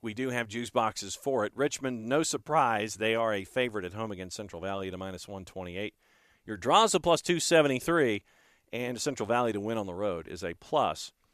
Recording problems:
none

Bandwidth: 14.5 kHz